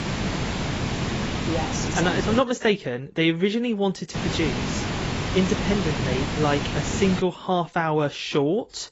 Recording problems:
garbled, watery; badly; nothing above 7.5 kHz
hiss; loud; until 2.5 s and from 4 to 7 s; 3 dB below the speech

